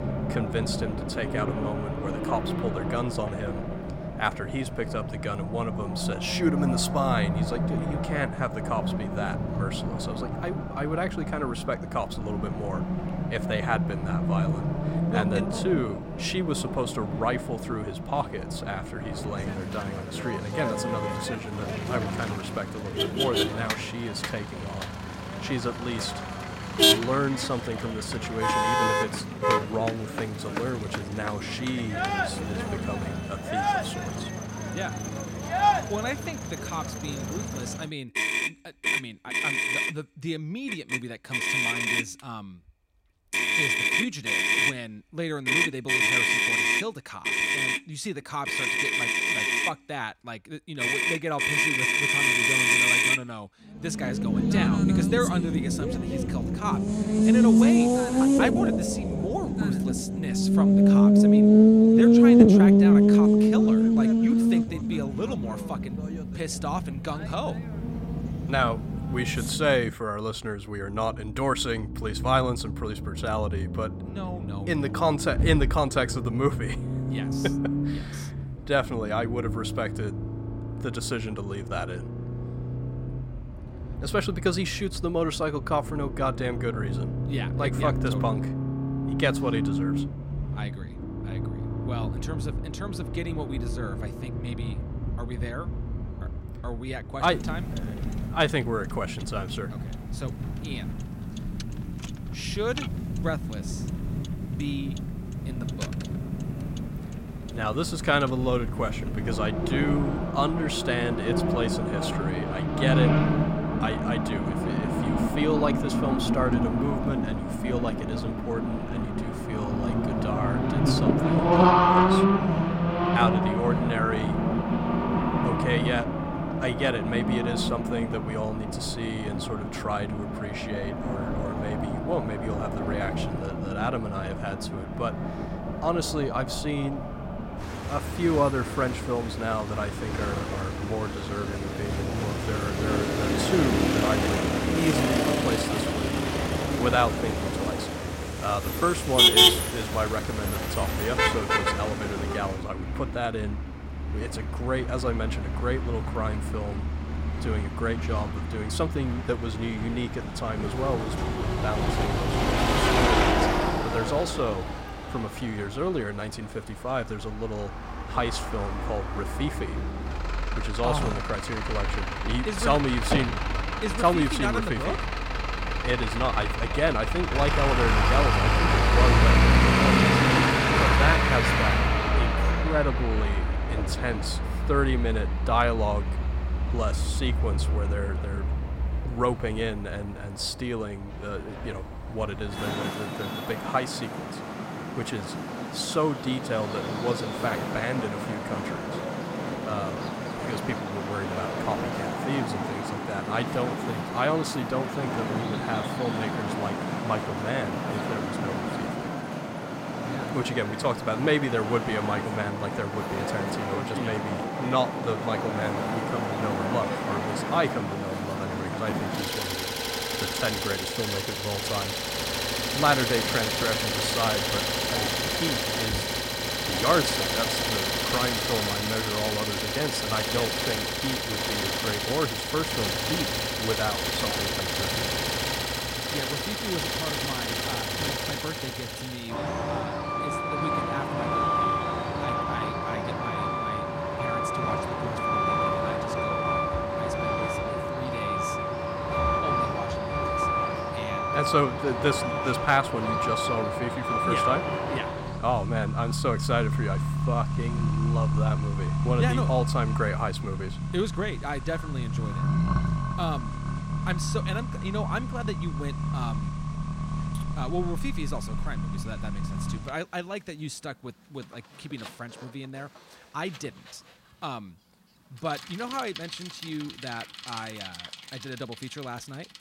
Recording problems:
traffic noise; very loud; throughout; 4 dB above the speech

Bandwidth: 16 kHz